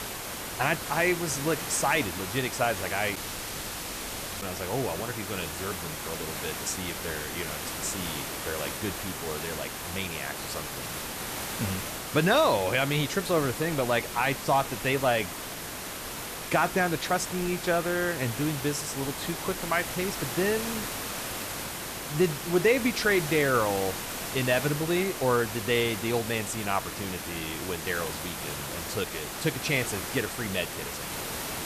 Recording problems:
hiss; loud; throughout; 5 dB below the speech
audio cutting out; at 3 s for 1.5 s

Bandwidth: 14.5 kHz